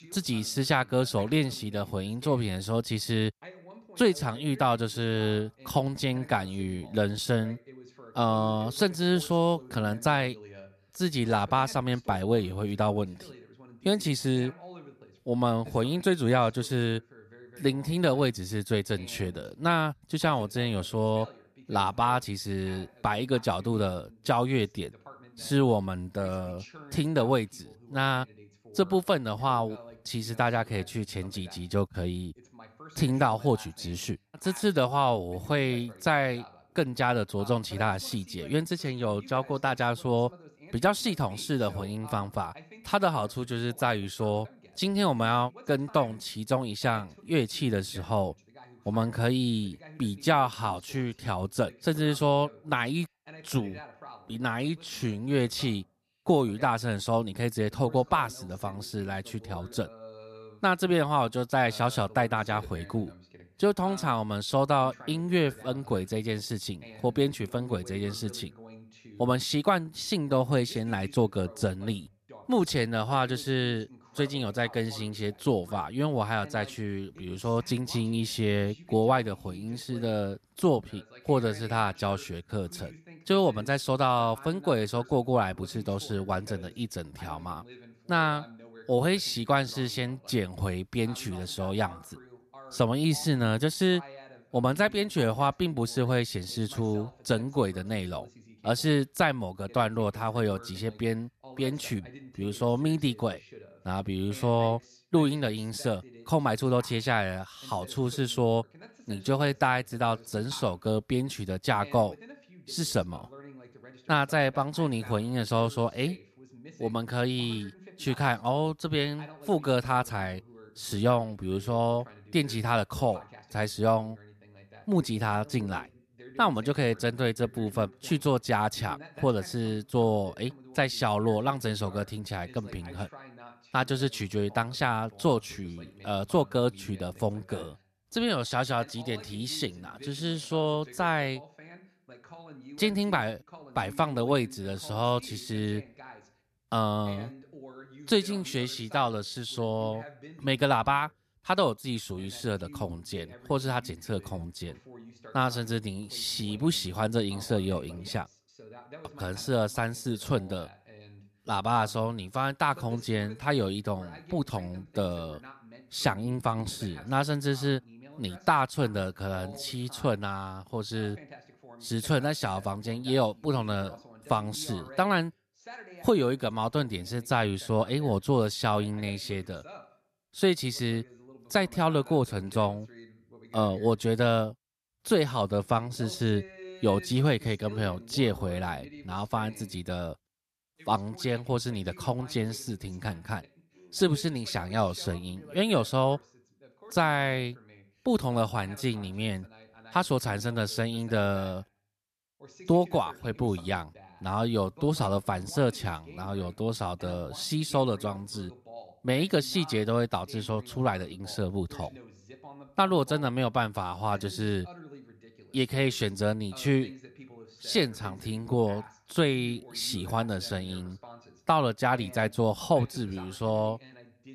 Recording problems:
voice in the background; faint; throughout; 20 dB below the speech

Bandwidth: 14 kHz